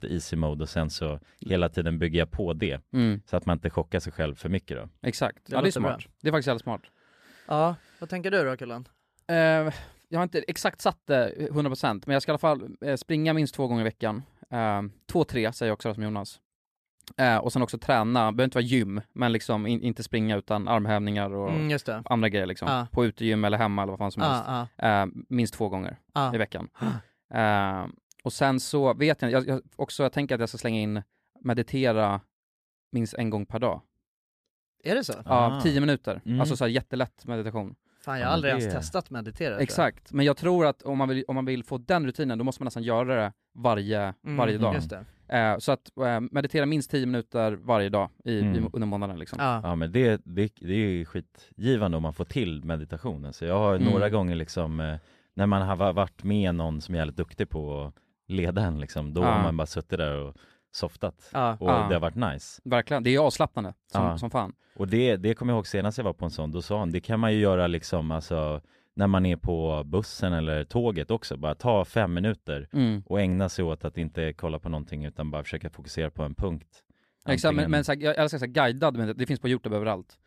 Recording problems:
none

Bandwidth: 14.5 kHz